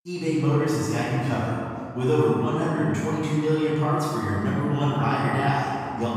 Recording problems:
room echo; strong; dies away in 2.4 s
off-mic speech; far

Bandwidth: 15.5 kHz